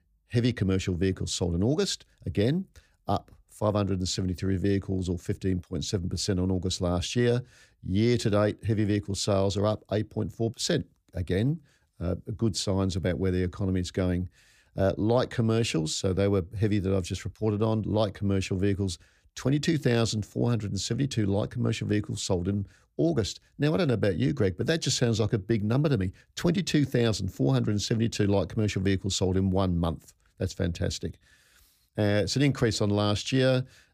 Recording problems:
none

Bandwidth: 15 kHz